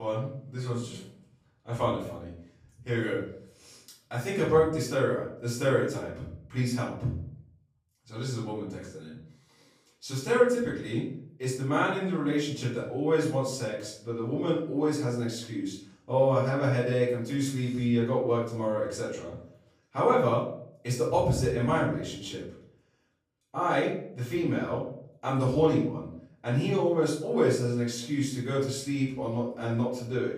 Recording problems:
off-mic speech; far
room echo; noticeable; dies away in 0.5 s
abrupt cut into speech; at the start

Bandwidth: 15 kHz